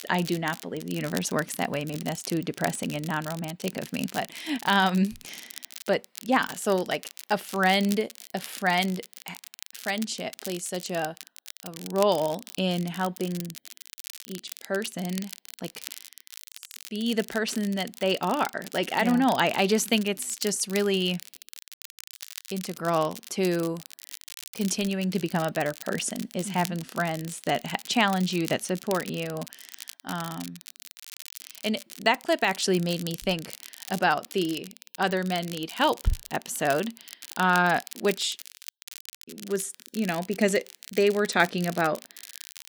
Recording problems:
crackle, like an old record; noticeable; 15 dB below the speech

